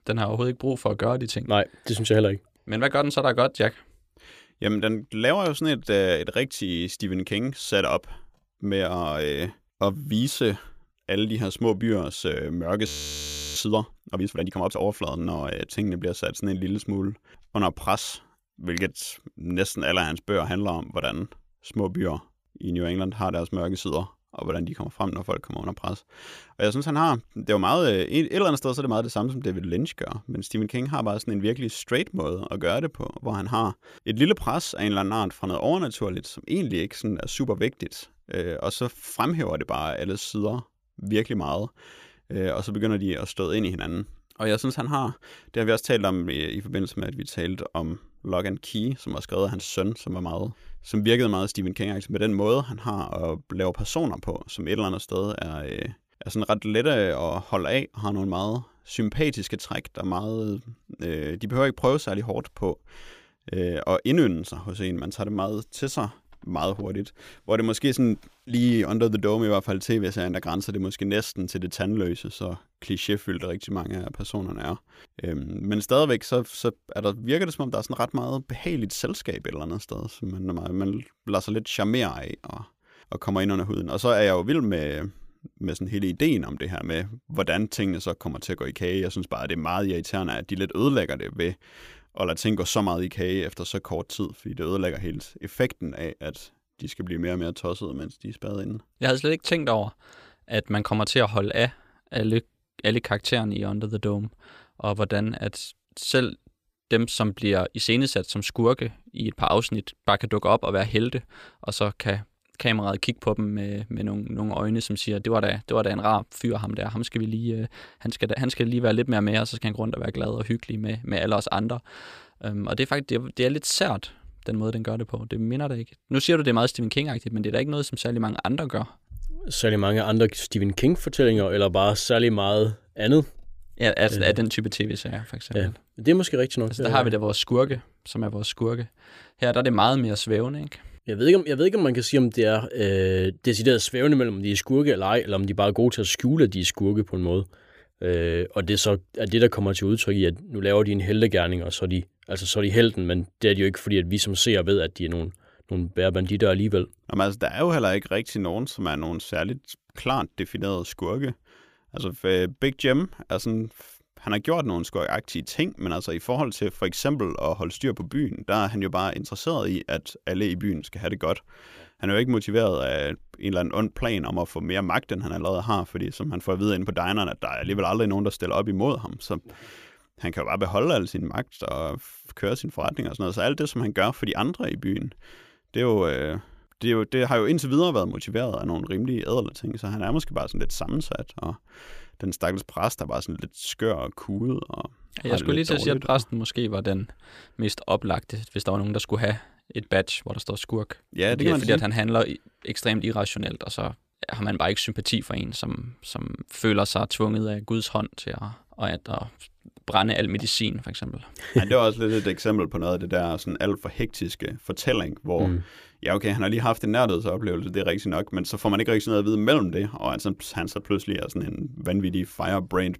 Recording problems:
audio freezing; at 13 s for 0.5 s

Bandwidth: 15 kHz